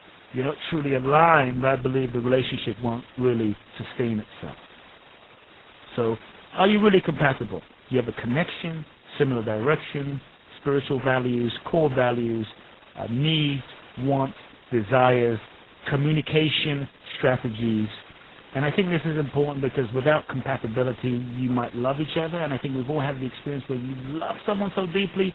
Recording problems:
garbled, watery; badly; nothing above 4 kHz
hiss; faint; throughout; 25 dB below the speech

